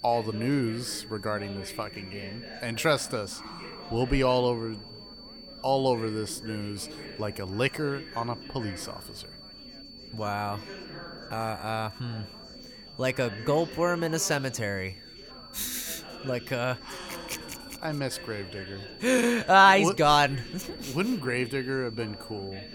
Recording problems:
high-pitched whine; noticeable; throughout; 4.5 kHz, 20 dB below the speech
chatter from many people; noticeable; throughout; 15 dB below the speech

